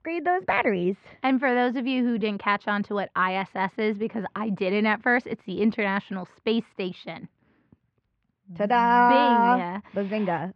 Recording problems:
muffled; very; fading above 2 kHz

